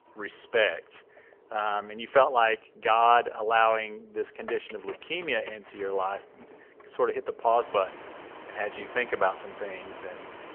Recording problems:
phone-call audio; nothing above 3 kHz
traffic noise; noticeable; throughout; 20 dB below the speech

